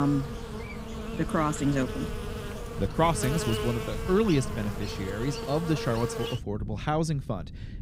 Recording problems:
electrical hum; loud; until 6.5 s; 60 Hz, 6 dB below the speech
wind noise on the microphone; occasional gusts; 20 dB below the speech
abrupt cut into speech; at the start

